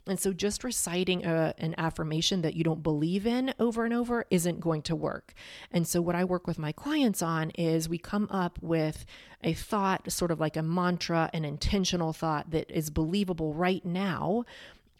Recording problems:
none

